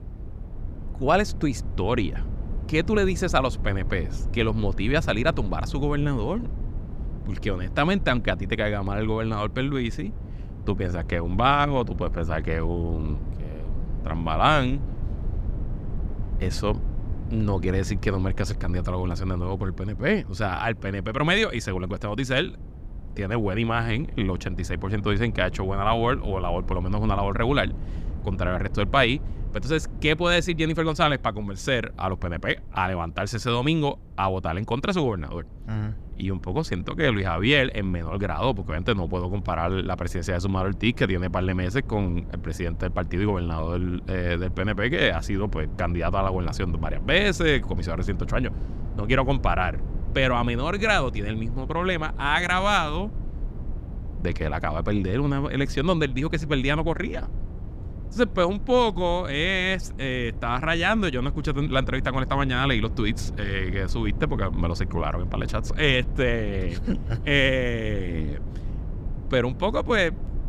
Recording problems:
low rumble; faint; throughout; 20 dB below the speech

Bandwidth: 14.5 kHz